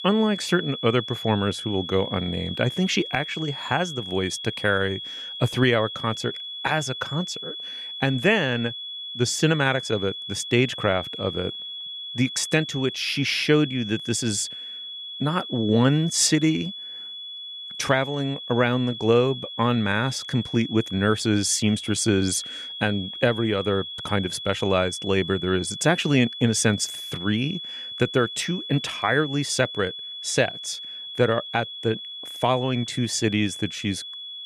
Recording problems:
high-pitched whine; loud; throughout; 3.5 kHz, 9 dB below the speech

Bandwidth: 14.5 kHz